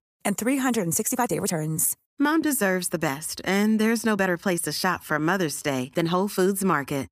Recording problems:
uneven, jittery; strongly; from 1 to 6 s

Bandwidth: 15 kHz